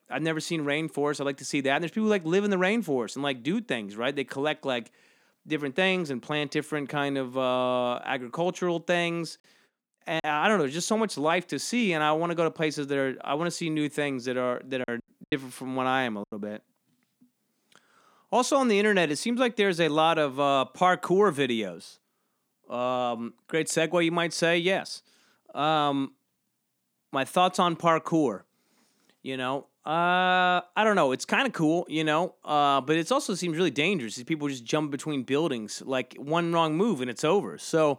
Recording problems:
choppy; very; at 10 s and from 15 to 16 s; 10% of the speech affected

